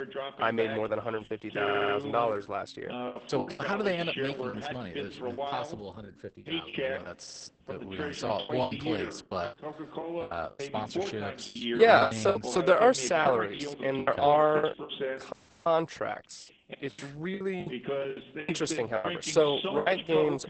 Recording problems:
garbled, watery; badly; nothing above 8 kHz
voice in the background; loud; throughout; 7 dB below the speech
choppy; very; 11% of the speech affected
audio stuttering; at 1.5 s and at 7 s
audio cutting out; at 15 s

